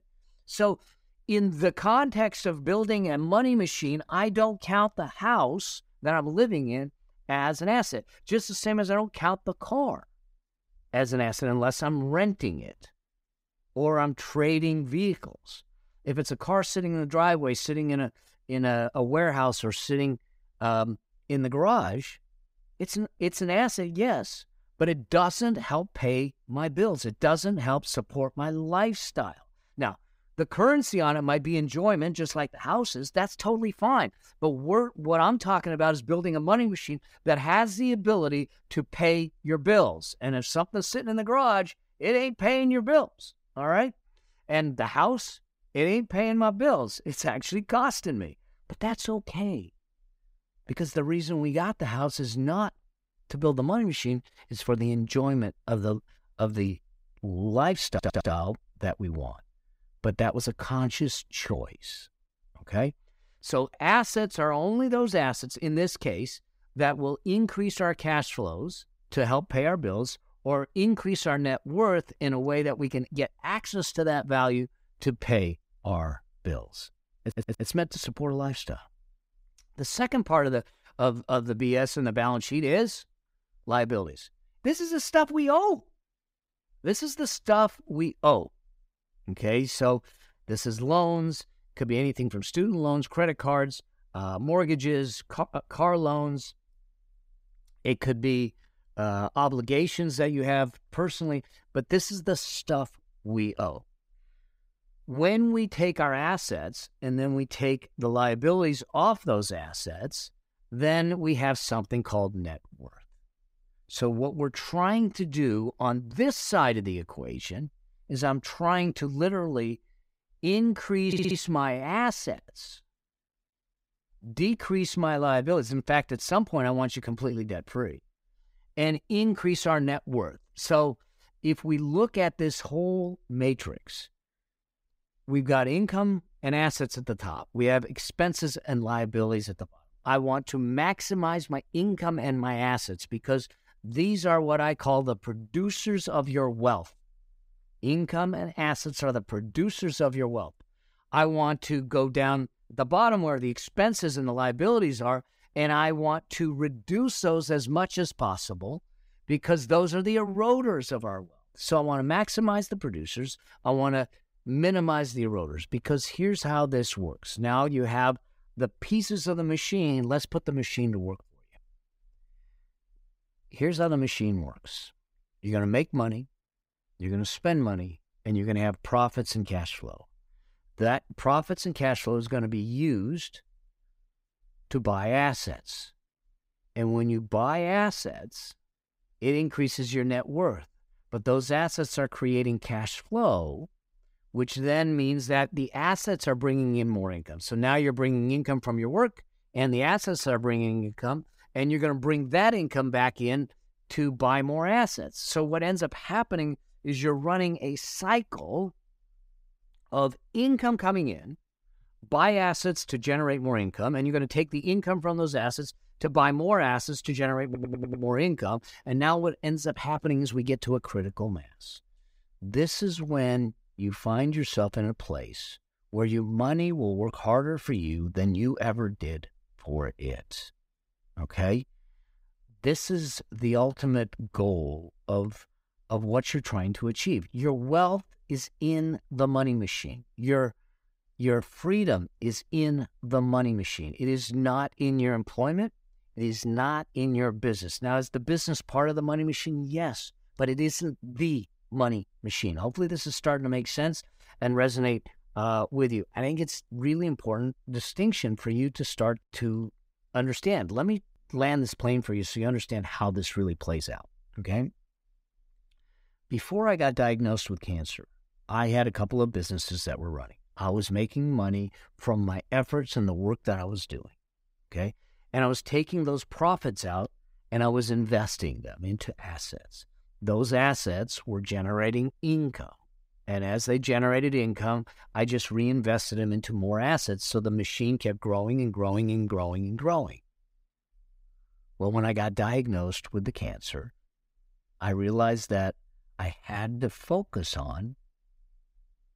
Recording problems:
audio stuttering; 4 times, first at 58 s

